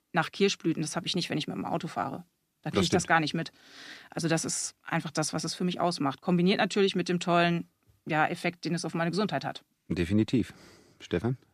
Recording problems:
none

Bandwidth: 14.5 kHz